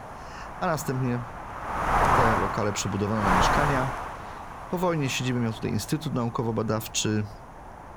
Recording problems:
wind noise on the microphone; heavy; 5 dB above the speech

